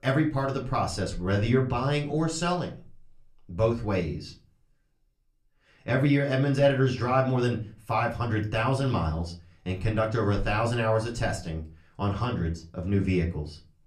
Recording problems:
off-mic speech; far
room echo; very slight; dies away in 0.3 s

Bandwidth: 14.5 kHz